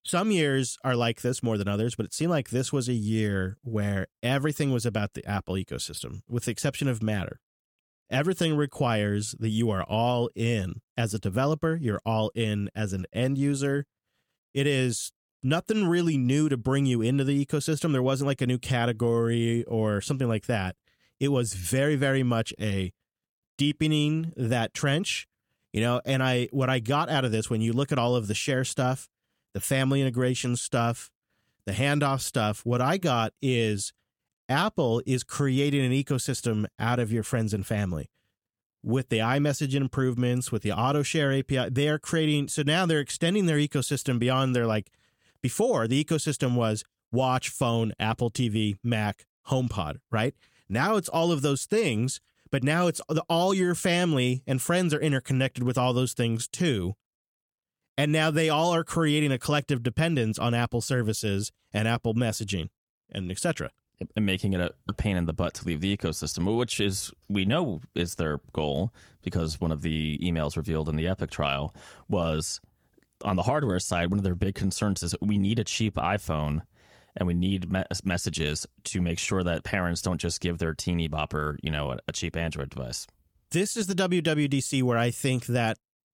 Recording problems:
none

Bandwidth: 18.5 kHz